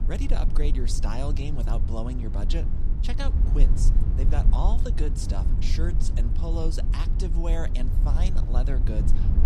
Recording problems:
low rumble; loud; throughout; 6 dB below the speech

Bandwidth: 15.5 kHz